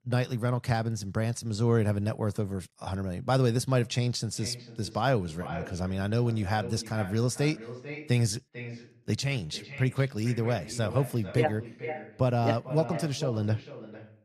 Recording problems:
echo of what is said; noticeable; from 4.5 s on; 440 ms later, 15 dB below the speech

